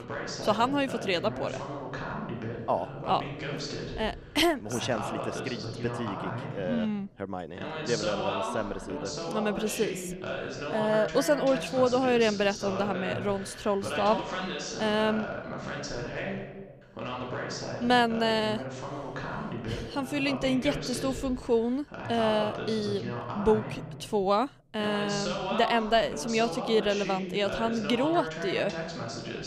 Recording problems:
voice in the background; loud; throughout; 7 dB below the speech

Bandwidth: 15 kHz